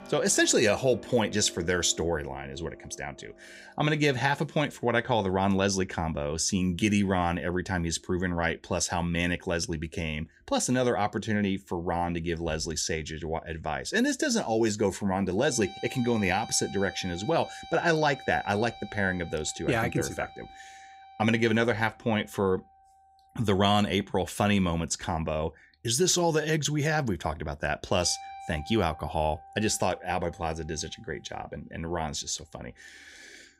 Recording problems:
background music; noticeable; throughout; 20 dB below the speech

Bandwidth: 15.5 kHz